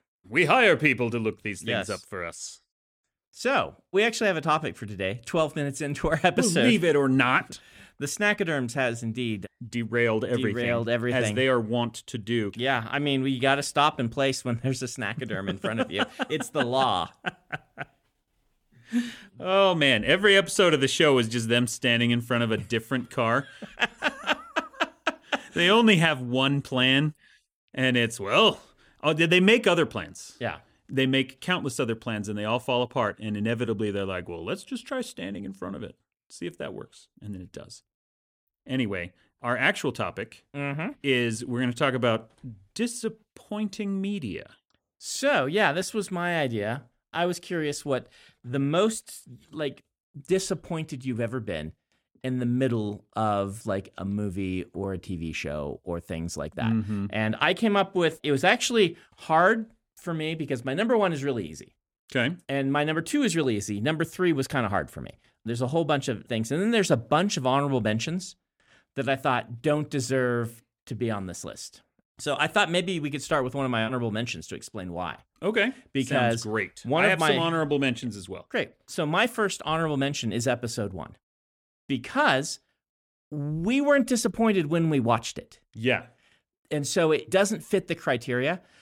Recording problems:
none

